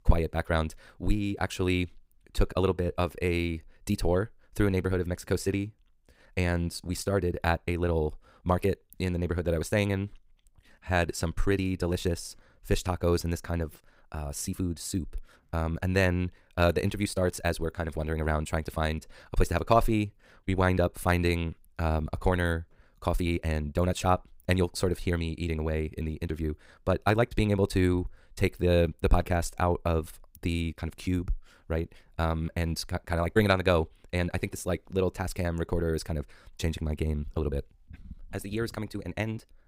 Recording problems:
wrong speed, natural pitch; too fast; 1.7 times normal speed

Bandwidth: 15.5 kHz